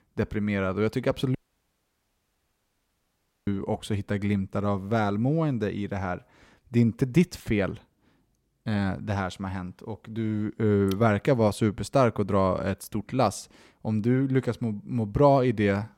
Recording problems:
audio cutting out; at 1.5 s for 2 s

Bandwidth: 16 kHz